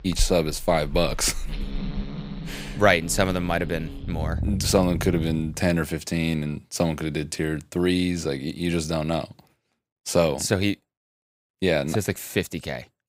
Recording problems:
animal sounds; loud; until 5.5 s; 9 dB below the speech

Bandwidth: 15.5 kHz